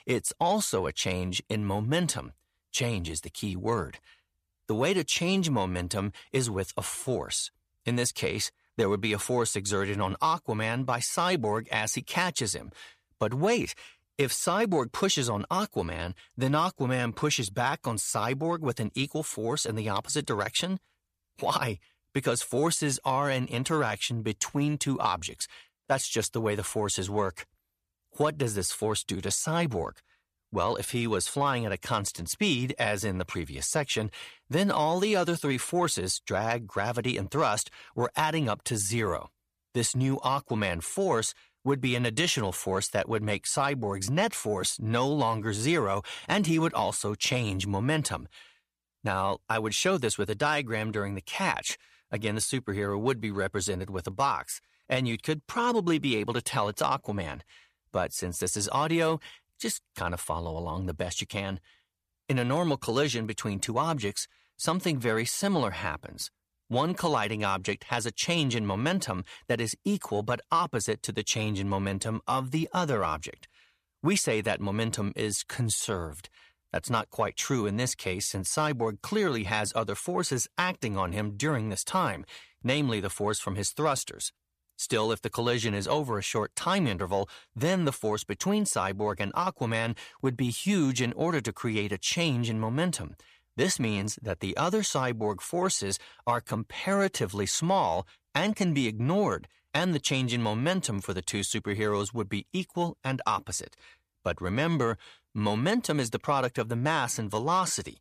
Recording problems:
none

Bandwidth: 14.5 kHz